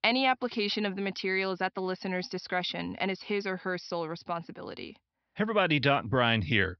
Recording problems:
high frequencies cut off; noticeable; nothing above 5.5 kHz

